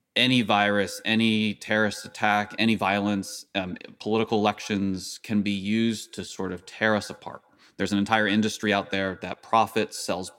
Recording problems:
echo of what is said; faint; throughout; 90 ms later, 25 dB below the speech
uneven, jittery; strongly; from 1.5 to 9.5 s

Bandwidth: 16.5 kHz